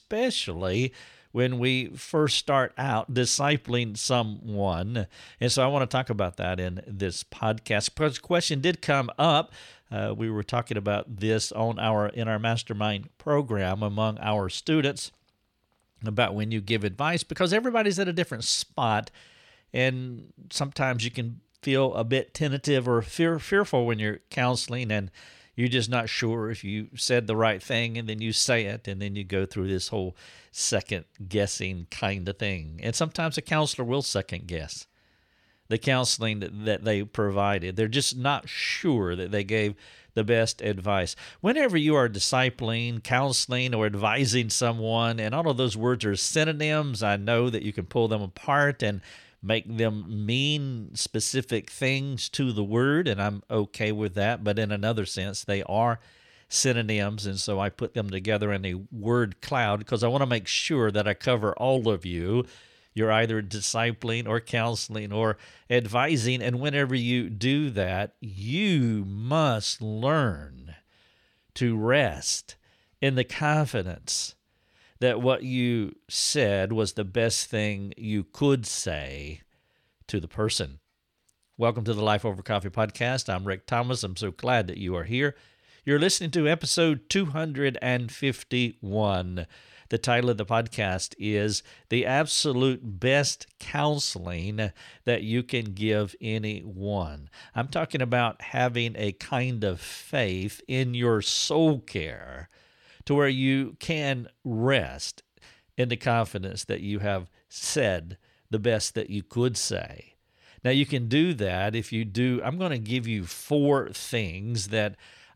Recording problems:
none

